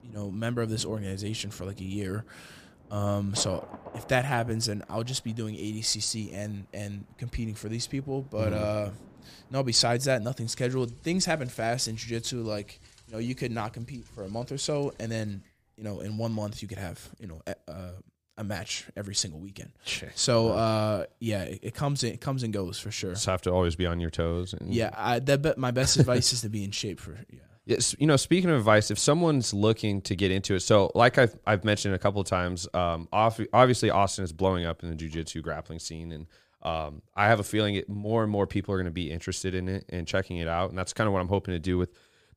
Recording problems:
rain or running water; faint; until 17 s; 25 dB below the speech

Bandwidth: 15 kHz